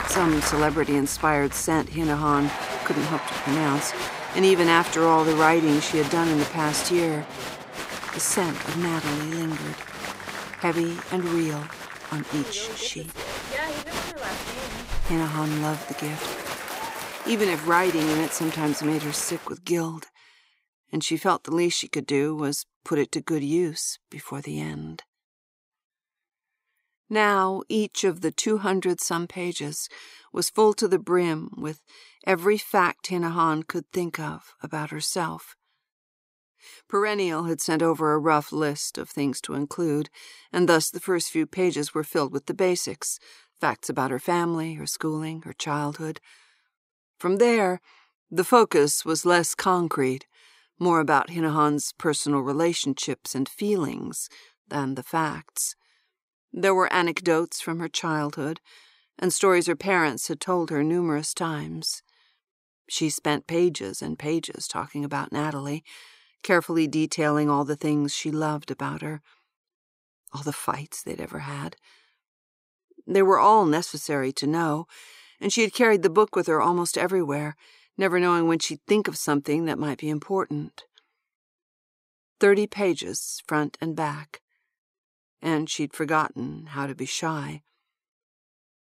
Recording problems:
crowd noise; loud; until 19 s; 8 dB below the speech

